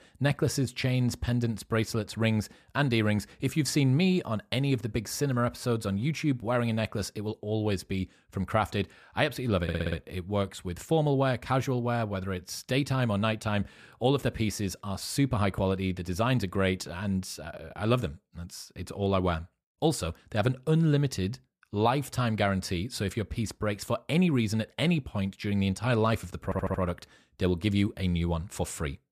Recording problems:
audio stuttering; at 9.5 s and at 26 s

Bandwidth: 14.5 kHz